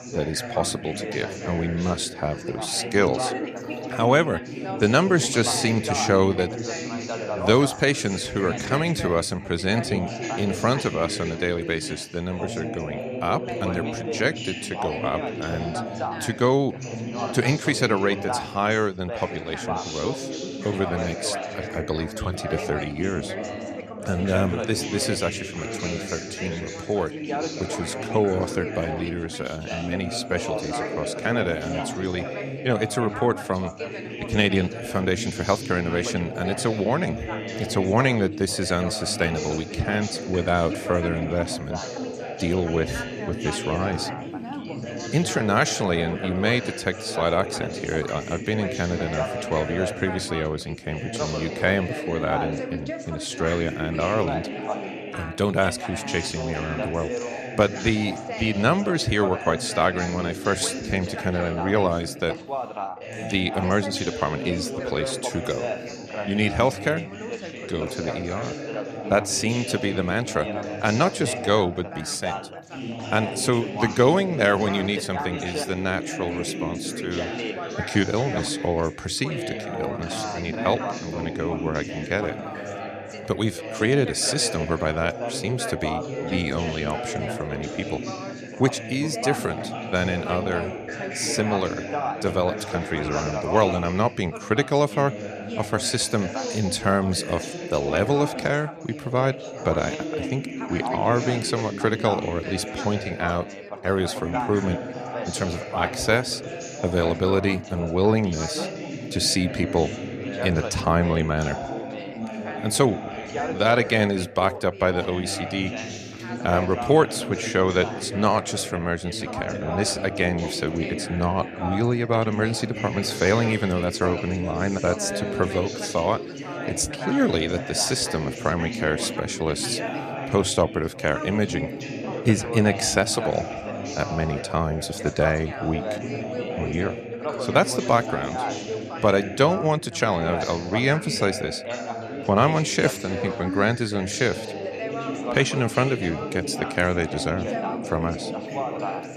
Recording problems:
background chatter; loud; throughout; 3 voices, 6 dB below the speech

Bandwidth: 14 kHz